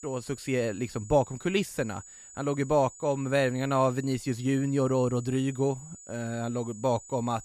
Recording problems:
high-pitched whine; noticeable; throughout; 7 kHz, 20 dB below the speech

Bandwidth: 14.5 kHz